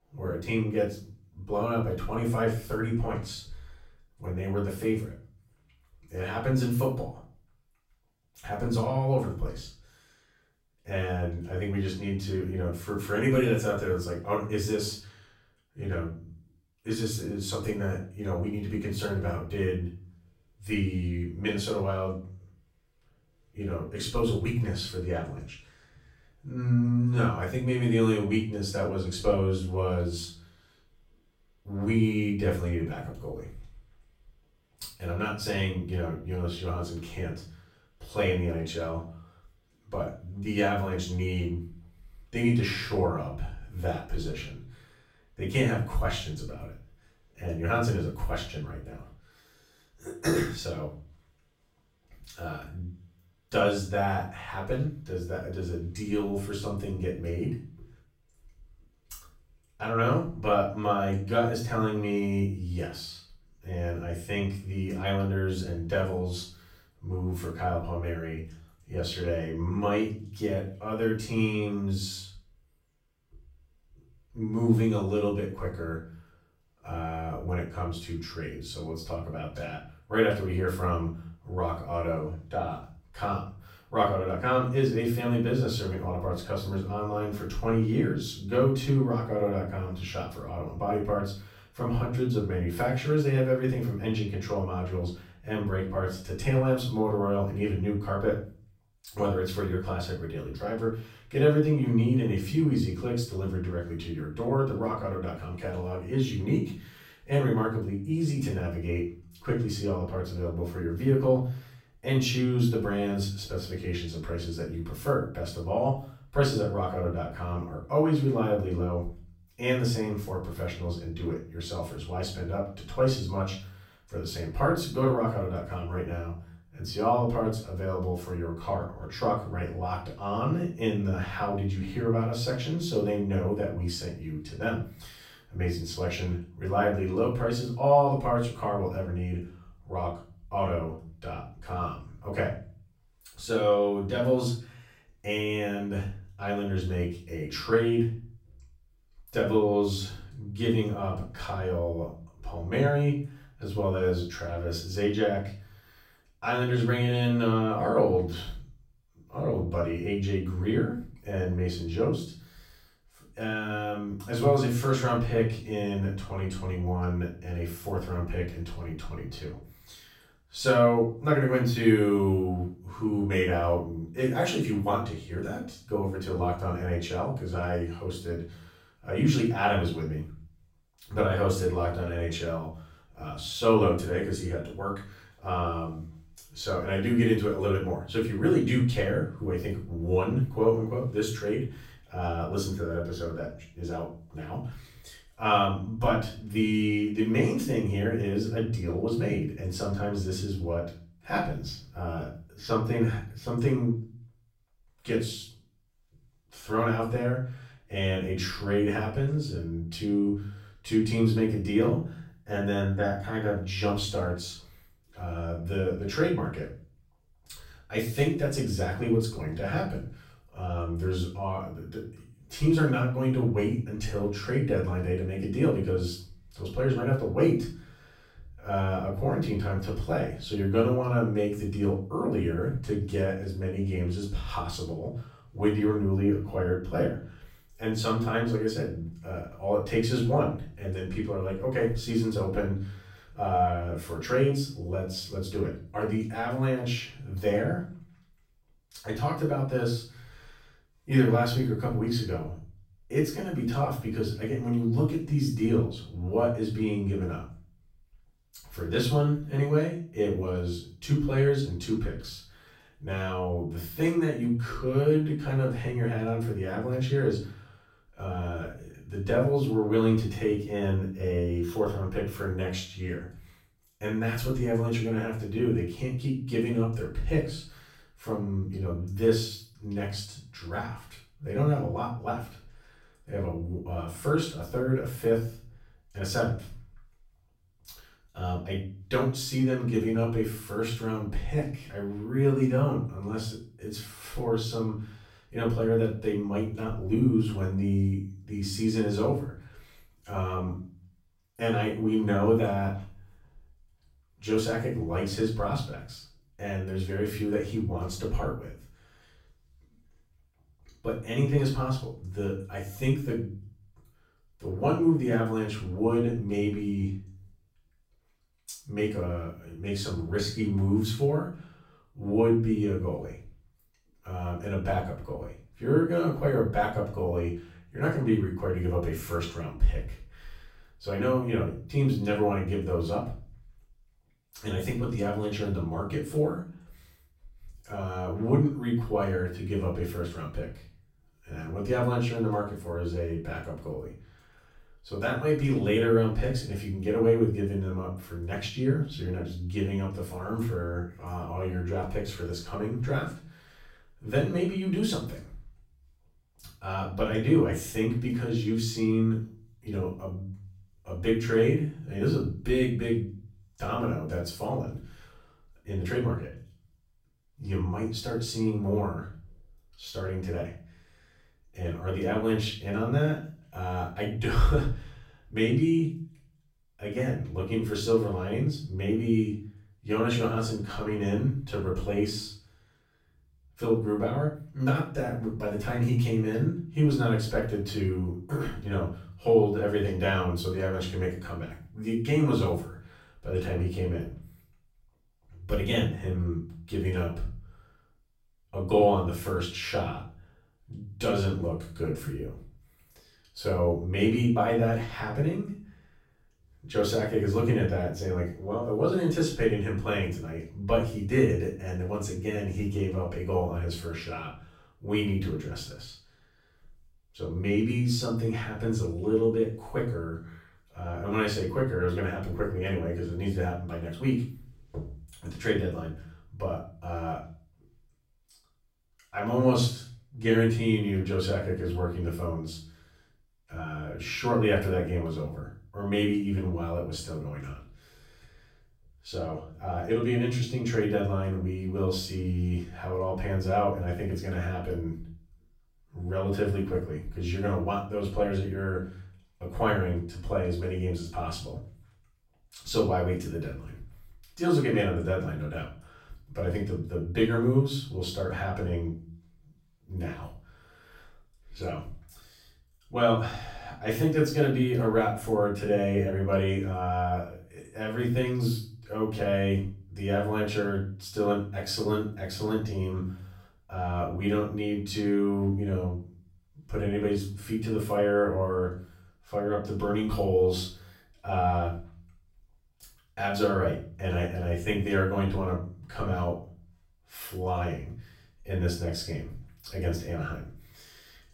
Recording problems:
off-mic speech; far
room echo; noticeable; dies away in 0.4 s

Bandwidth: 16.5 kHz